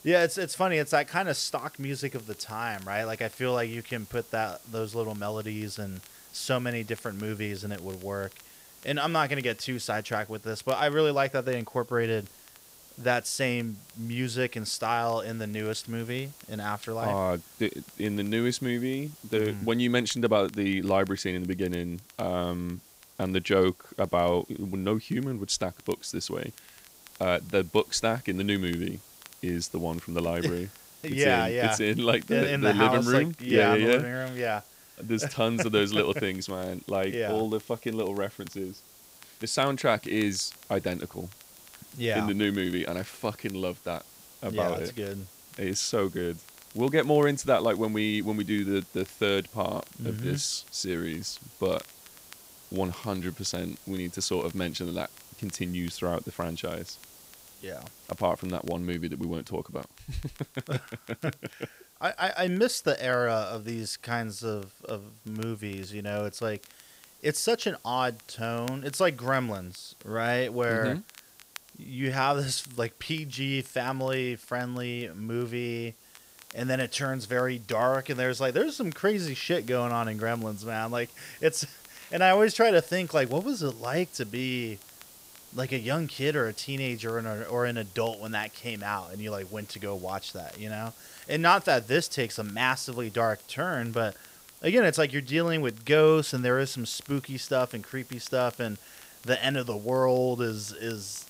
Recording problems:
hiss; faint; throughout; 20 dB below the speech
crackle, like an old record; faint; 25 dB below the speech

